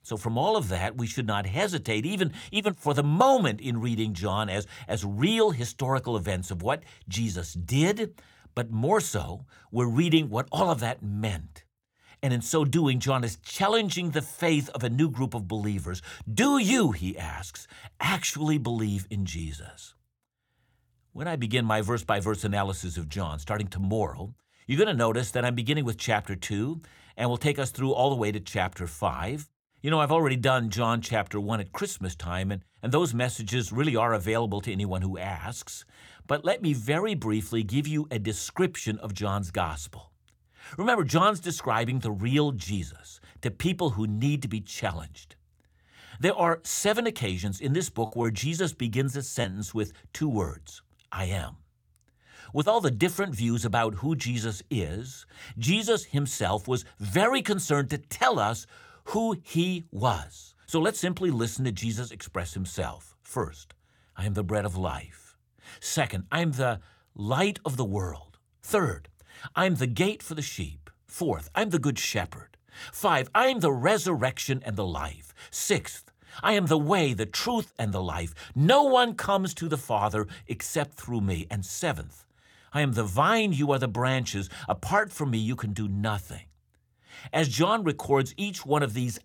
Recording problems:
choppy; occasionally; from 48 to 49 s; 1% of the speech affected

